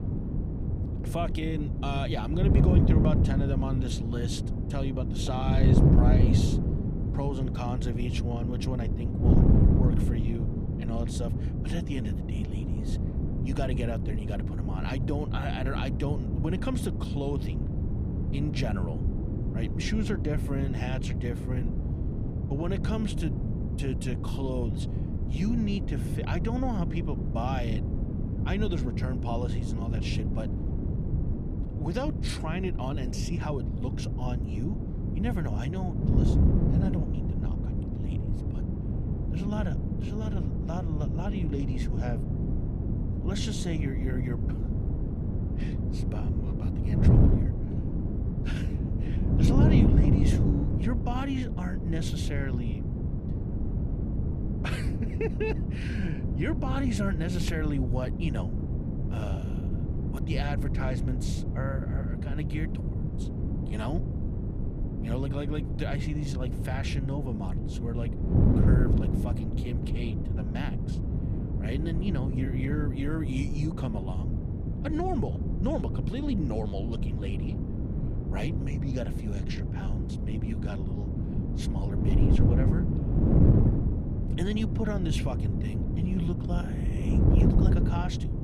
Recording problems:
wind noise on the microphone; heavy; 1 dB below the speech

